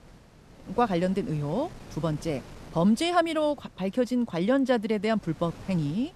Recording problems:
wind noise on the microphone; occasional gusts; 20 dB below the speech

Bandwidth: 13.5 kHz